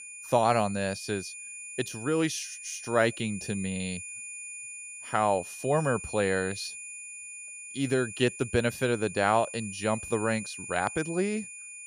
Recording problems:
high-pitched whine; noticeable; throughout; 2.5 kHz, 10 dB below the speech

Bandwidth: 15.5 kHz